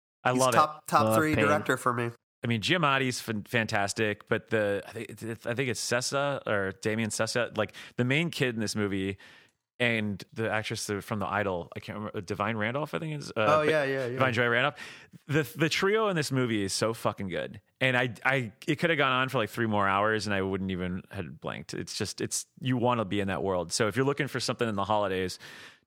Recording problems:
none

